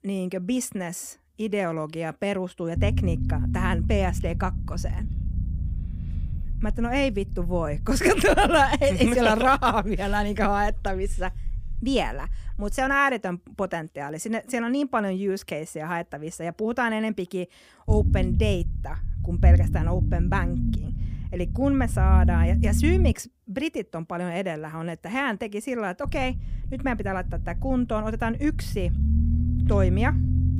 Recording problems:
low rumble; noticeable; from 3 to 13 s, from 18 to 23 s and from 26 s on; 15 dB below the speech

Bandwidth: 15.5 kHz